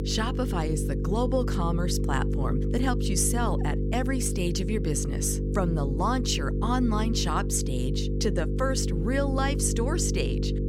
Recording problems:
electrical hum; loud; throughout; 50 Hz, 6 dB below the speech

